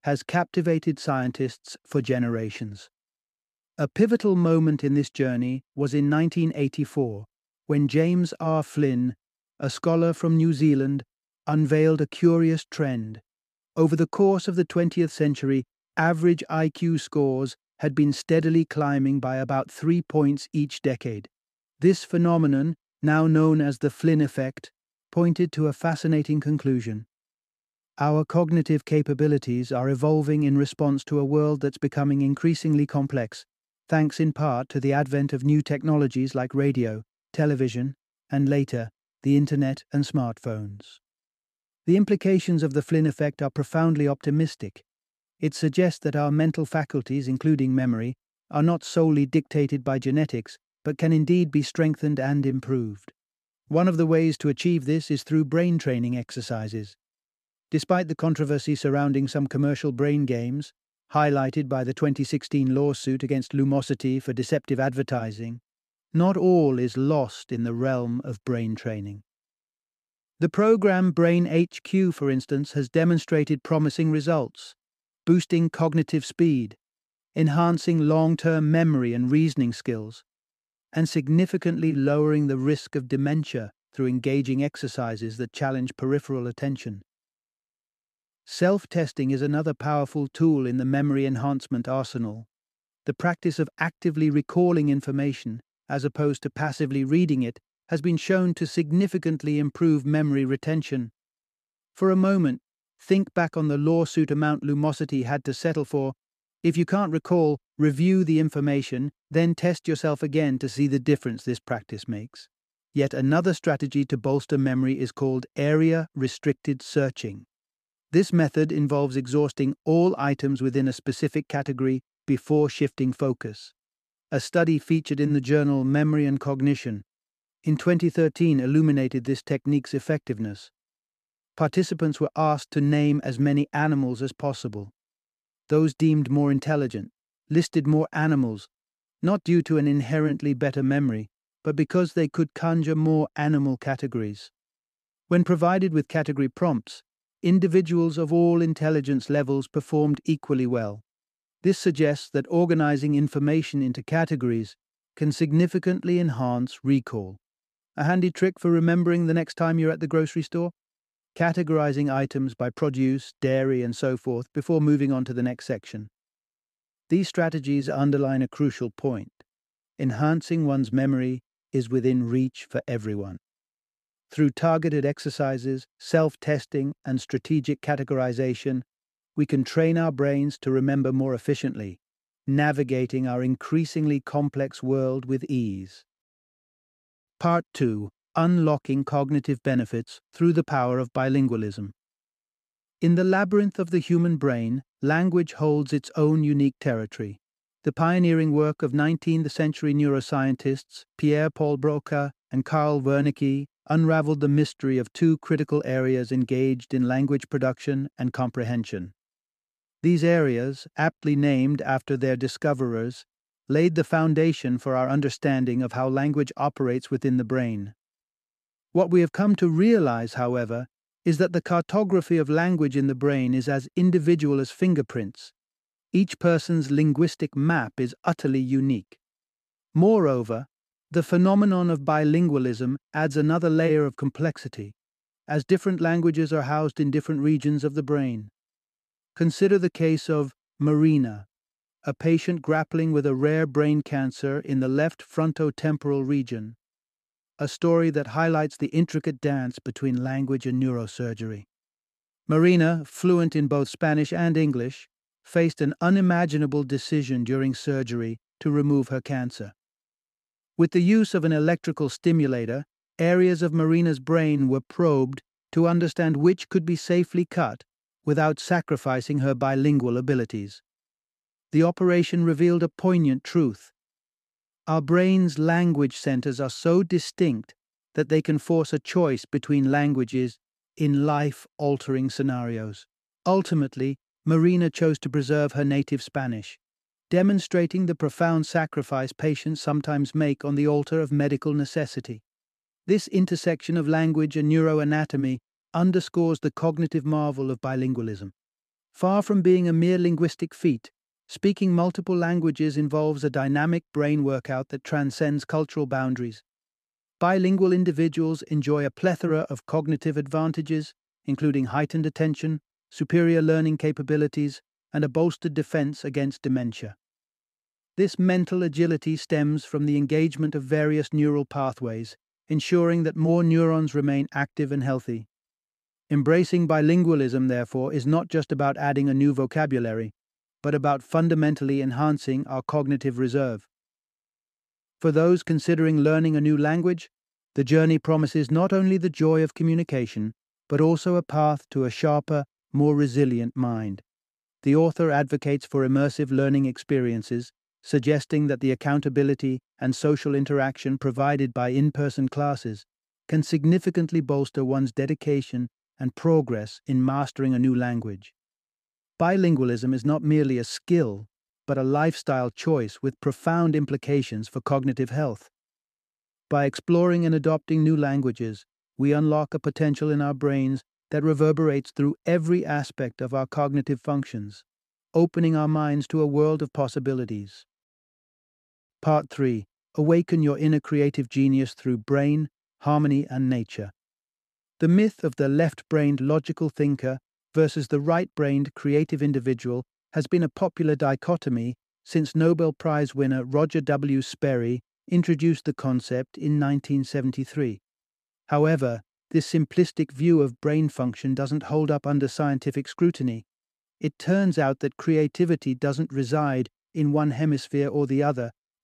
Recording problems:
none

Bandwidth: 14.5 kHz